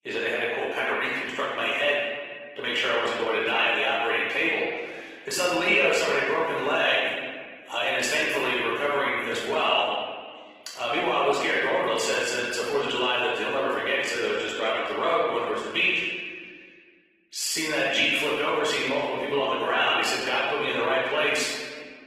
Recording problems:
off-mic speech; far
room echo; noticeable; dies away in 1.5 s
thin; somewhat; fading below 450 Hz
garbled, watery; slightly; nothing above 16.5 kHz

